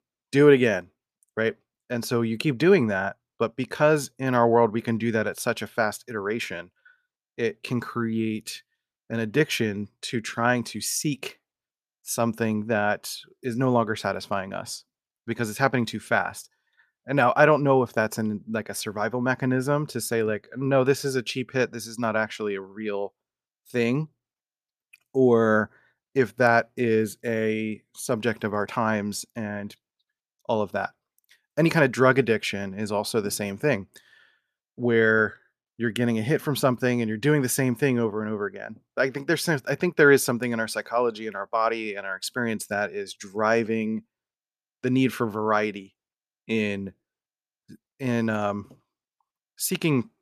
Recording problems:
none

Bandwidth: 14.5 kHz